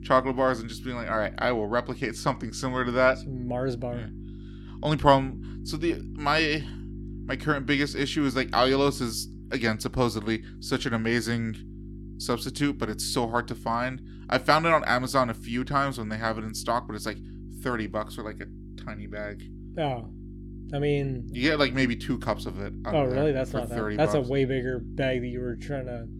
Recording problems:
electrical hum; faint; throughout; 50 Hz, 20 dB below the speech

